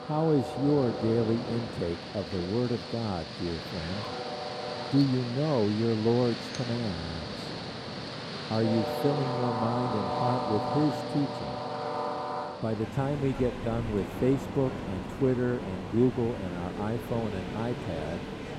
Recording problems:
train or aircraft noise; loud; throughout; 5 dB below the speech
audio stuttering; at 7 s

